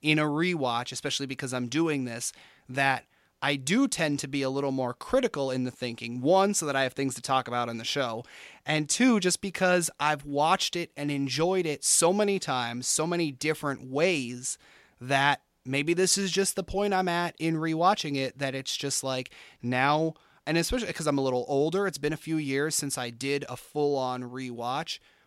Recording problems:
none

